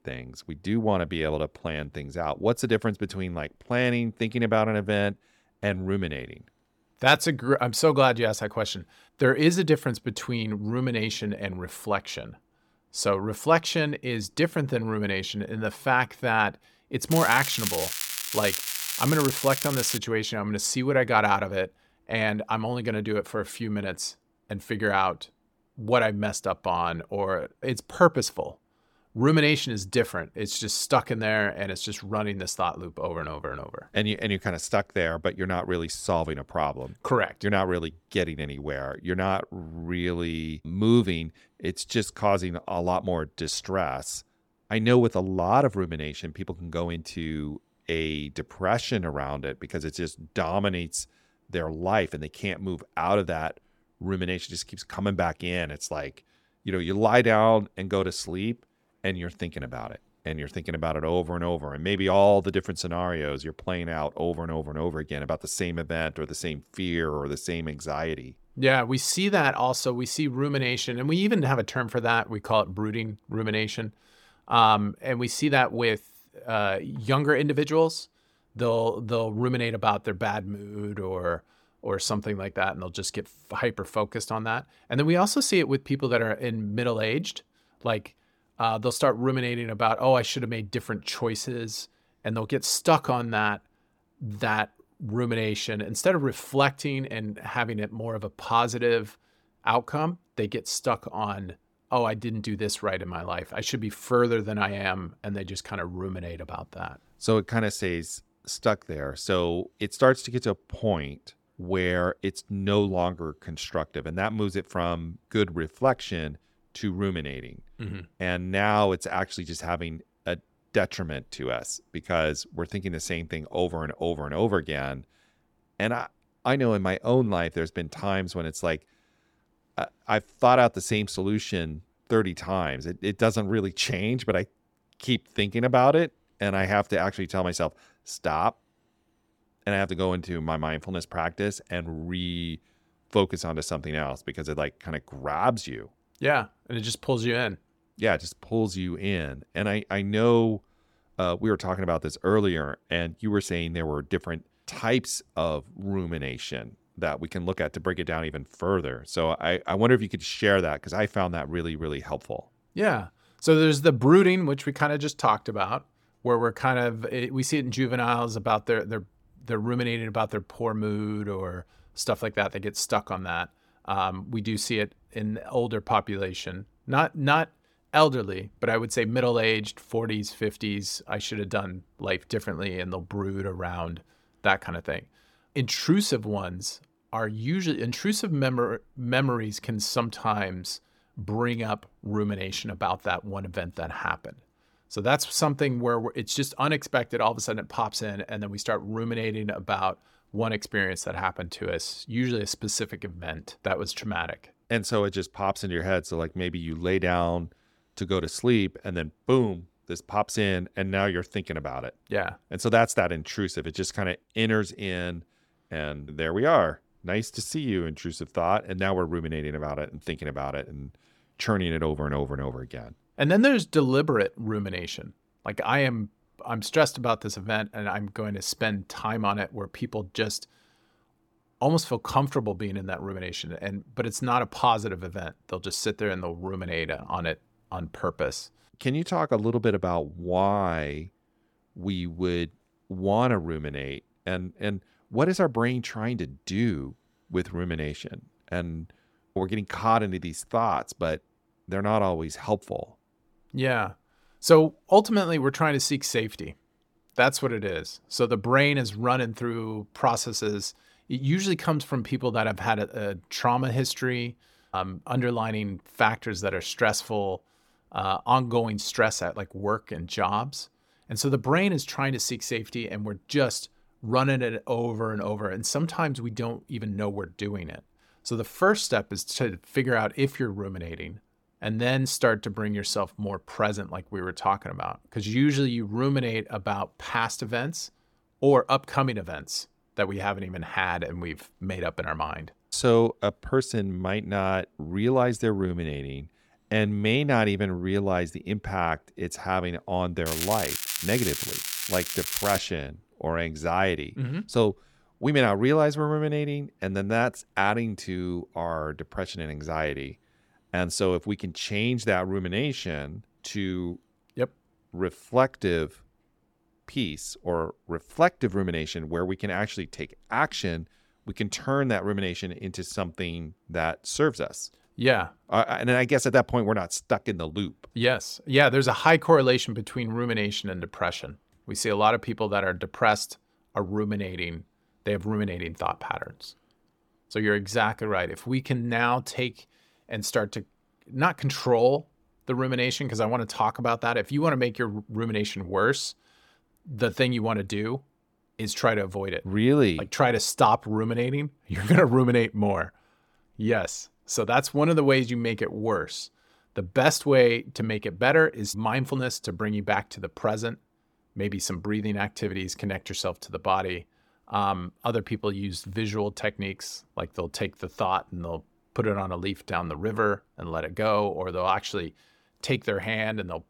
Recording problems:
crackling; loud; from 17 to 20 s and from 5:00 to 5:03; 3 dB below the speech

